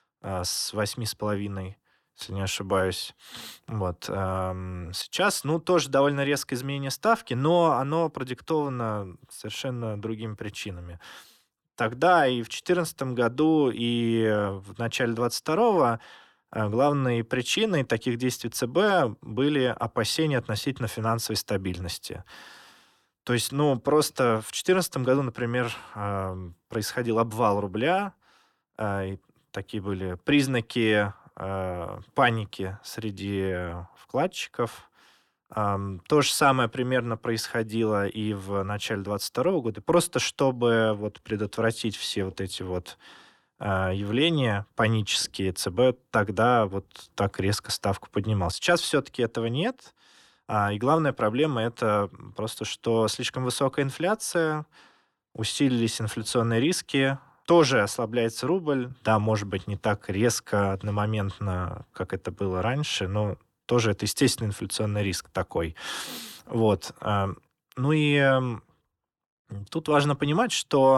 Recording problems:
abrupt cut into speech; at the end

